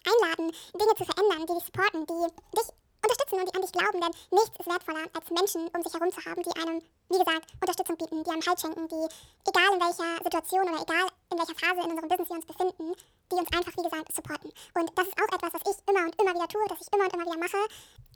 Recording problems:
wrong speed and pitch; too fast and too high; 1.7 times normal speed

